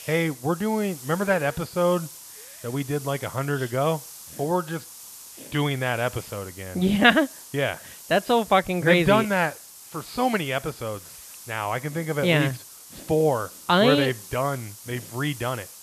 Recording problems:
high frequencies cut off; noticeable; nothing above 5 kHz
hiss; noticeable; throughout; 15 dB below the speech

